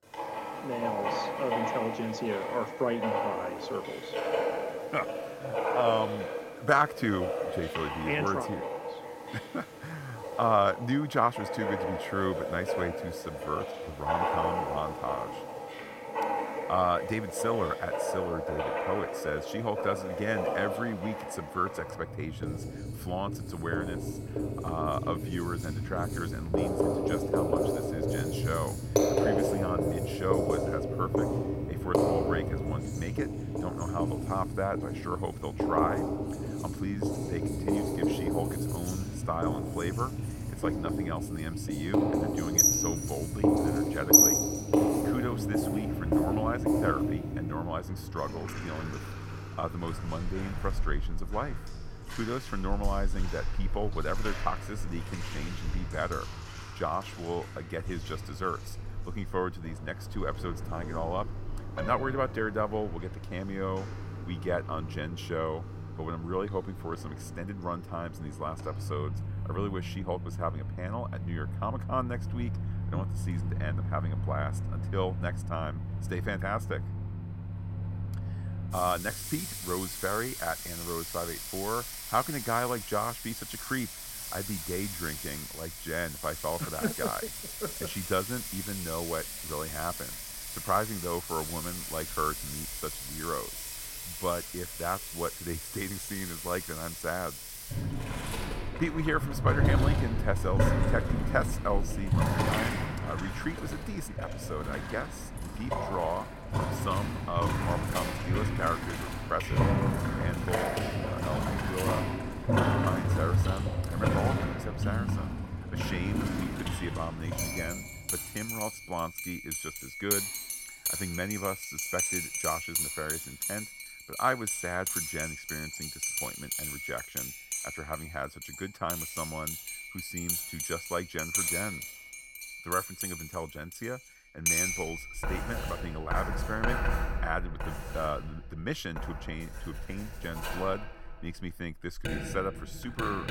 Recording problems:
household noises; very loud; throughout; 2 dB above the speech

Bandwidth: 16.5 kHz